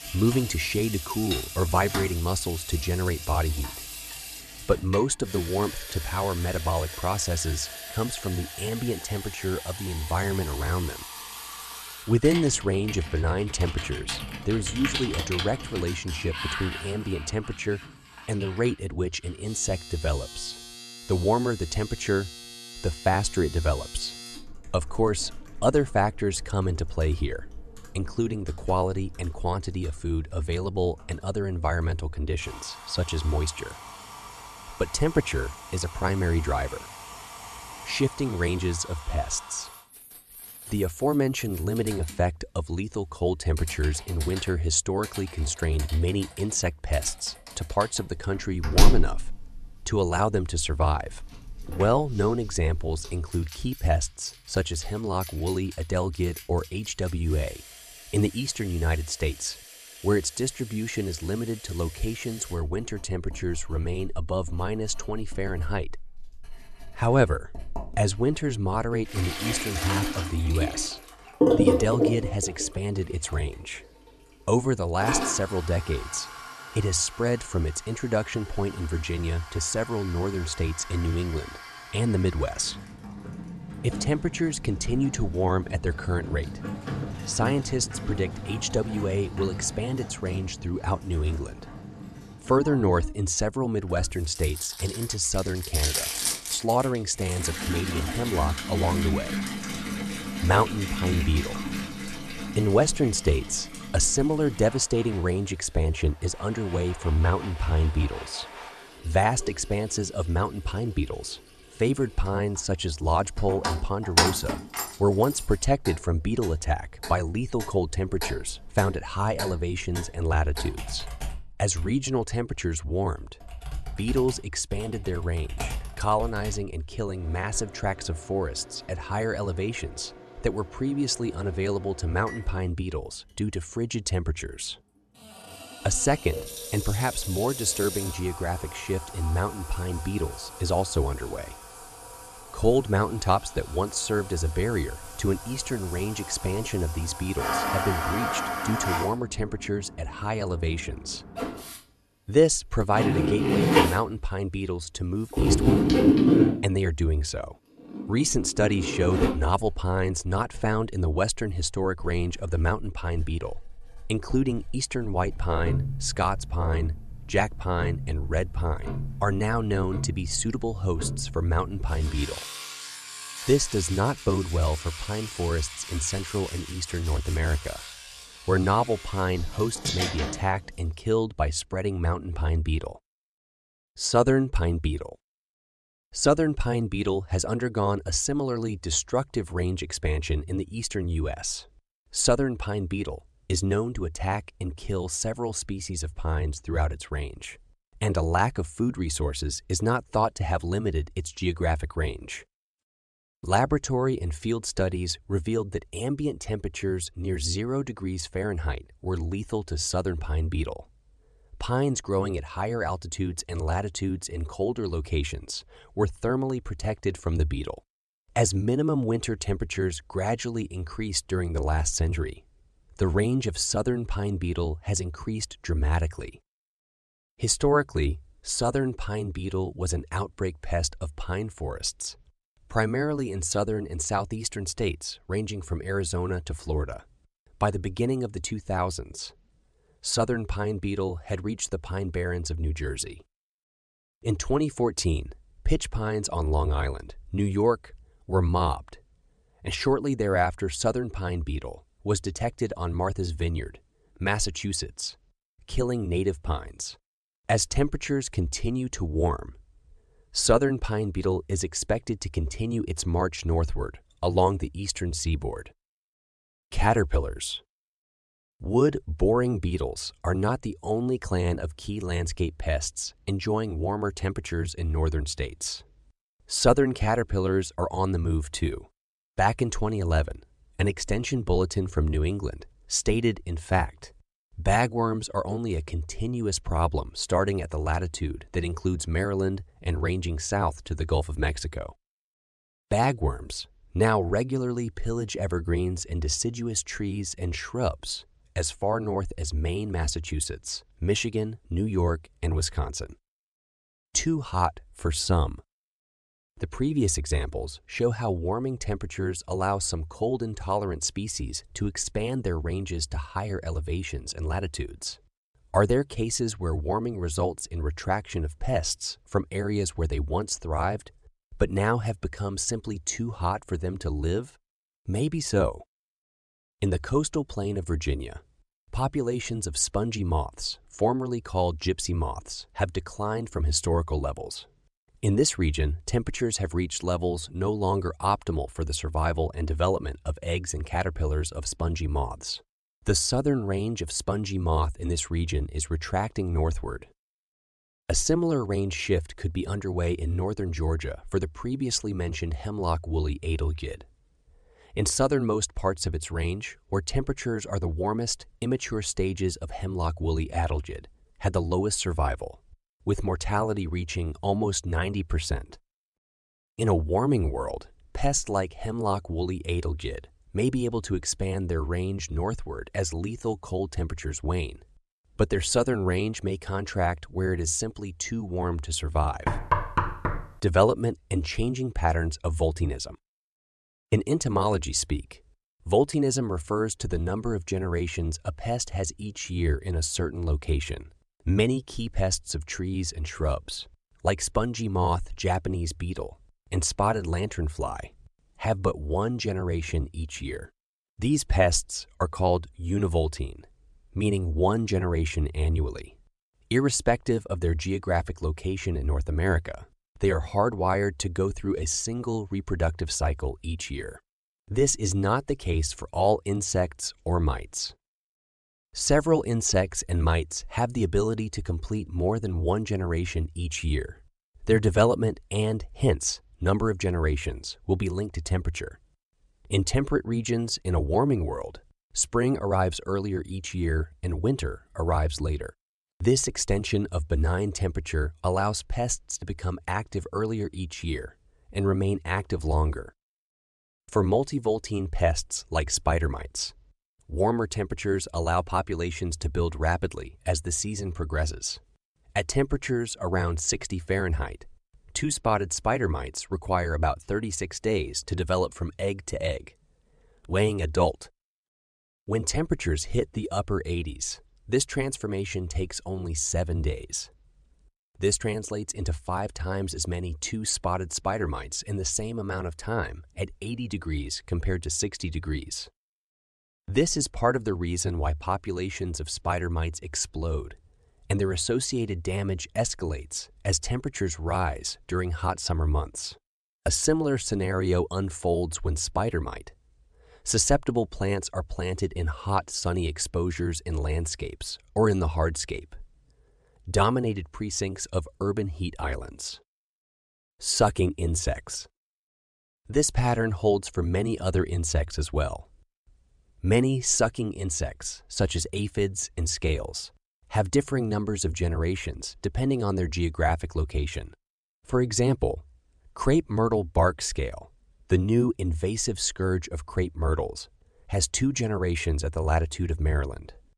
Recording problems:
household noises; loud; until 3:01; 5 dB below the speech
door banging; loud; at 6:19; peak 2 dB above the speech

